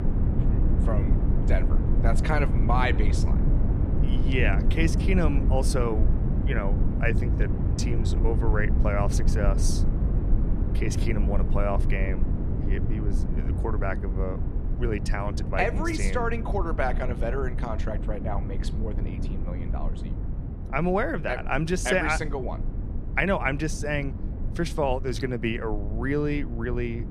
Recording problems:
low rumble; loud; throughout; 10 dB below the speech

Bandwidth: 14.5 kHz